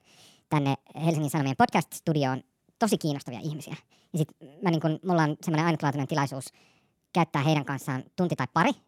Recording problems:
wrong speed and pitch; too fast and too high; 1.5 times normal speed

